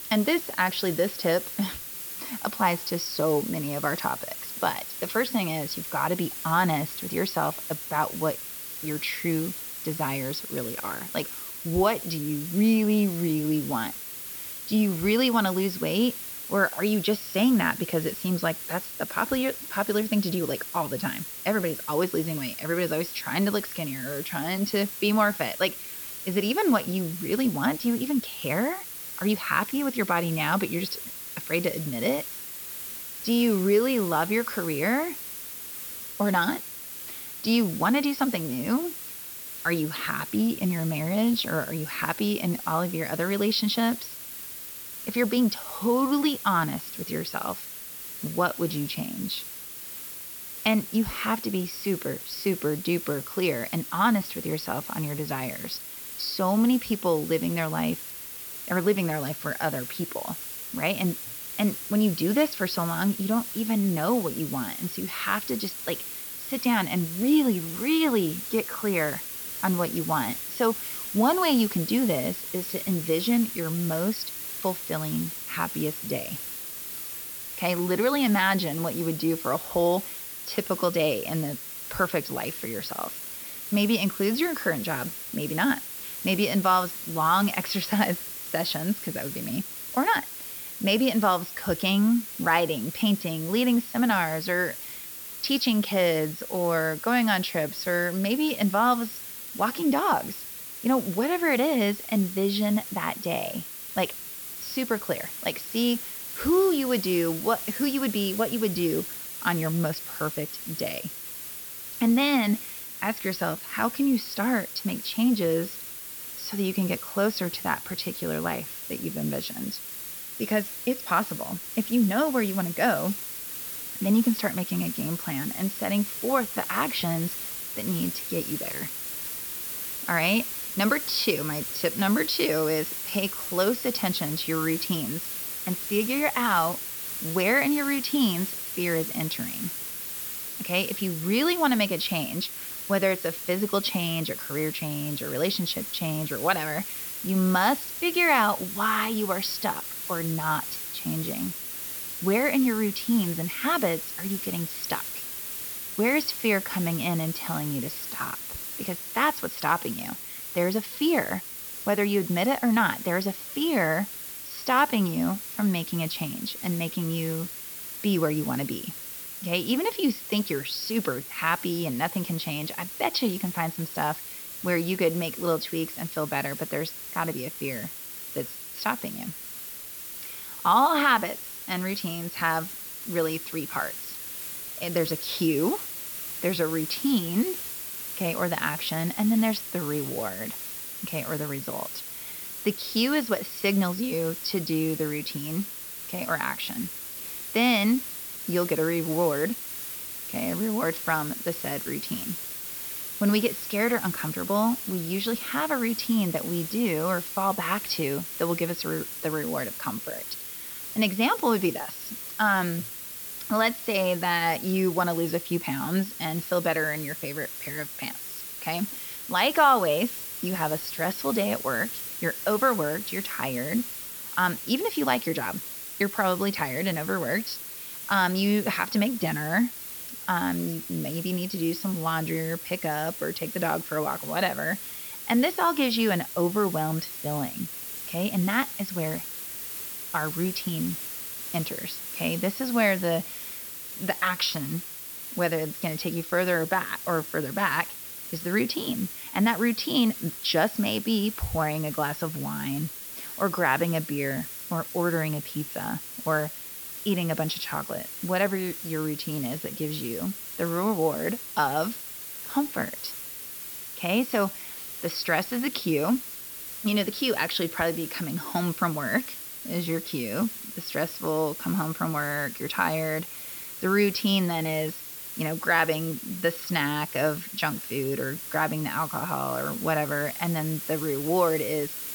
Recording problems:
high frequencies cut off; noticeable; nothing above 5.5 kHz
hiss; loud; throughout; 7 dB below the speech

